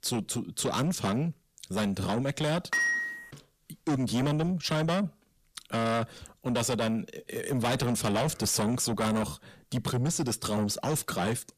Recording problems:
distortion; heavy; 6 dB below the speech
clattering dishes; loud; at 2.5 s; peak 4 dB above the speech

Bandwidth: 14.5 kHz